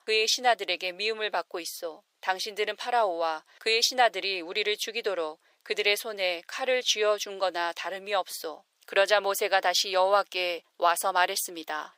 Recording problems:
thin; very; fading below 550 Hz

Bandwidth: 15.5 kHz